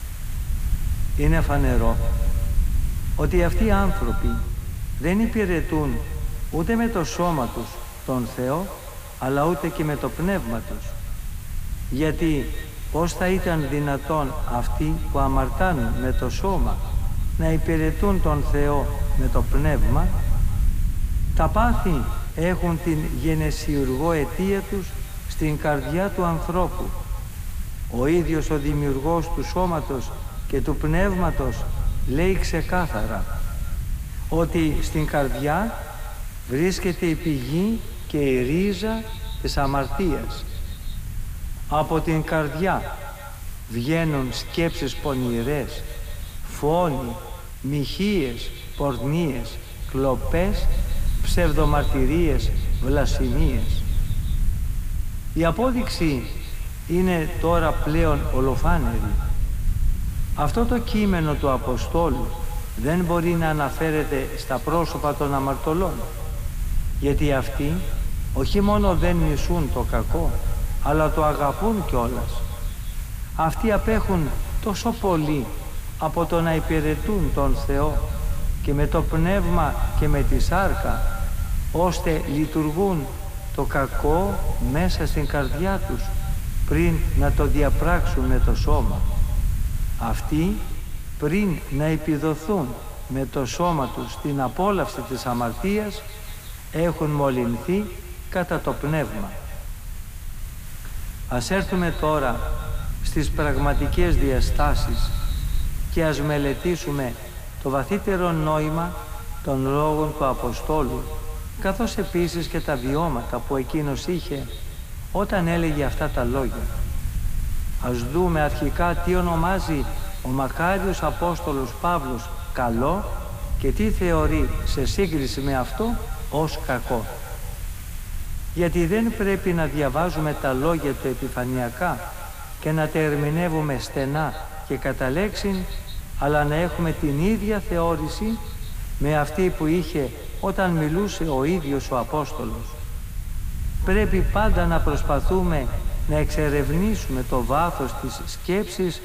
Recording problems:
echo of what is said; noticeable; throughout; 170 ms later, 15 dB below the speech
hiss; noticeable; throughout; 20 dB below the speech
low rumble; faint; throughout; 20 dB below the speech

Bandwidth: 15 kHz